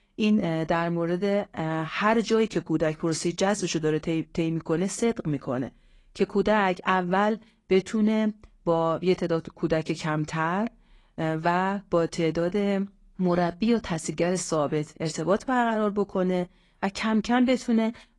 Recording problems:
garbled, watery; slightly; nothing above 10 kHz

